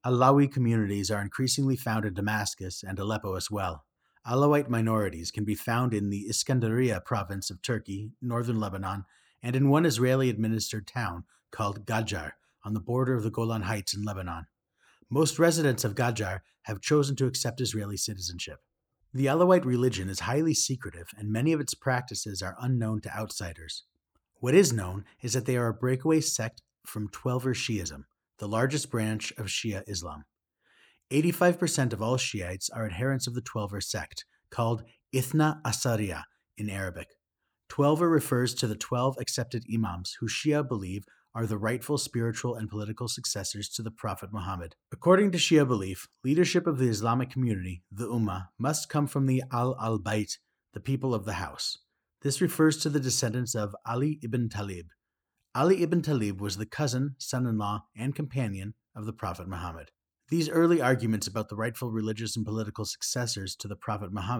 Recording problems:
abrupt cut into speech; at the end

